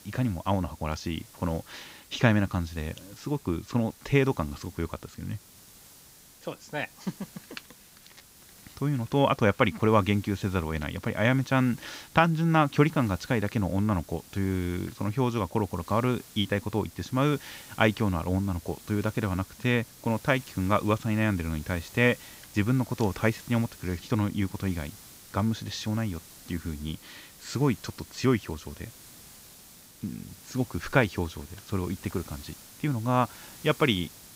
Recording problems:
high frequencies cut off; noticeable; nothing above 8 kHz
hiss; faint; throughout; 20 dB below the speech

